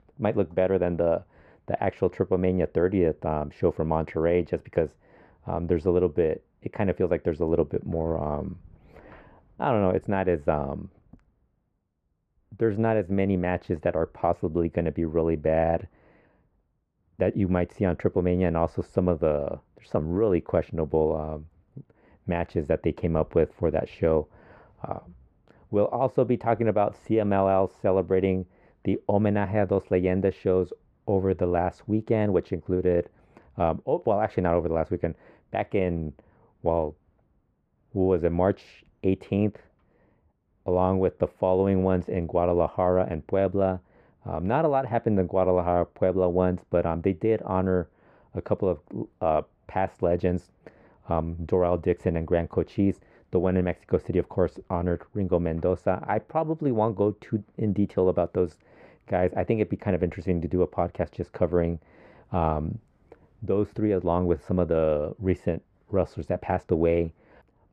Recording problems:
muffled; very; fading above 3 kHz

